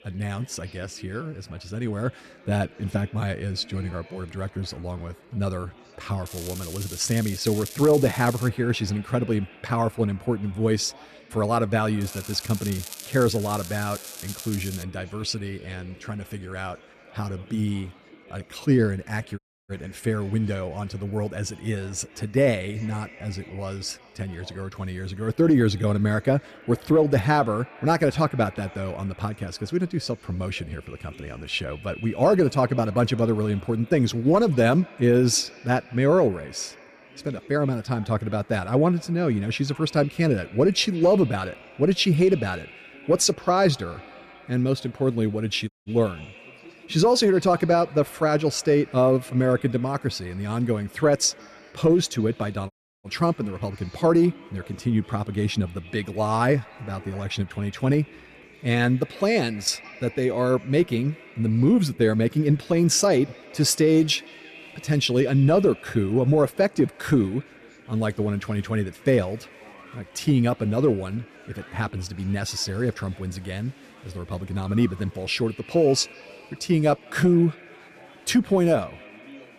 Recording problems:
echo of what is said; faint; throughout; 170 ms later, 25 dB below the speech
crackling; noticeable; from 6.5 to 8.5 s and from 12 to 15 s; 15 dB below the speech
chatter from many people; faint; throughout; 25 dB below the speech
audio cutting out; at 19 s, at 46 s and at 53 s

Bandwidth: 14 kHz